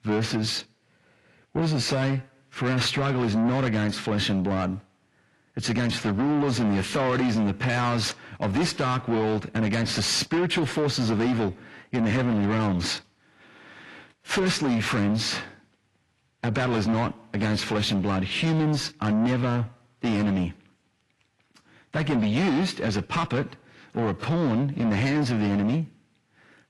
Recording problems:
distortion; heavy; 8 dB below the speech
garbled, watery; slightly; nothing above 11.5 kHz

